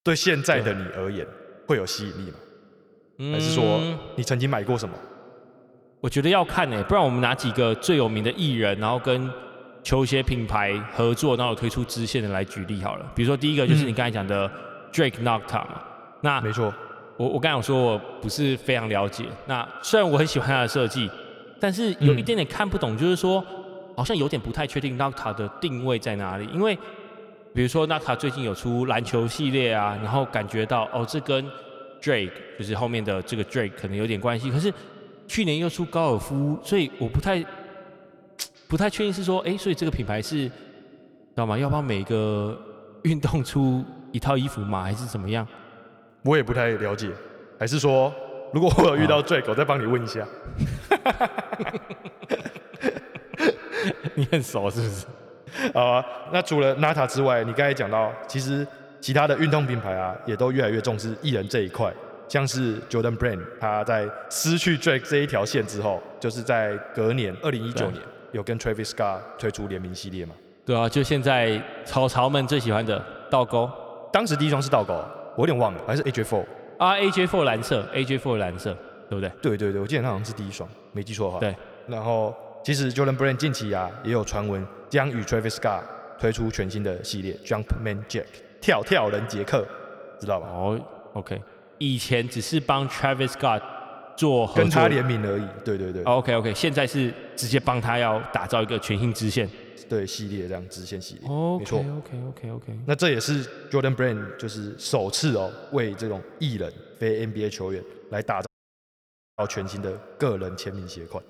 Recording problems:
echo of what is said; noticeable; throughout; 150 ms later, 15 dB below the speech
uneven, jittery; strongly; from 20 to 45 s
audio cutting out; at 1:48 for 1 s

